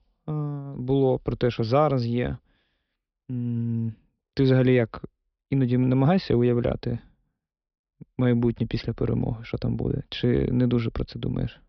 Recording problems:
high frequencies cut off; noticeable; nothing above 5.5 kHz

